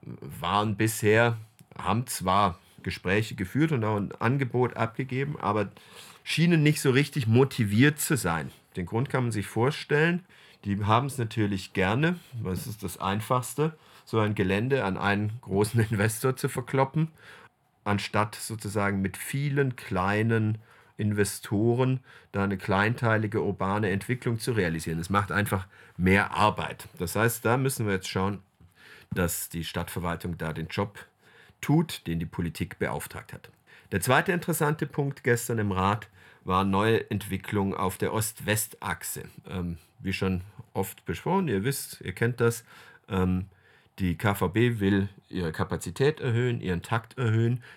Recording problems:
none

